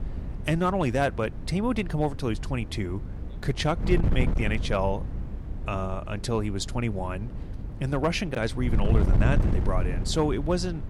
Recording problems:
wind noise on the microphone; occasional gusts; 10 dB below the speech

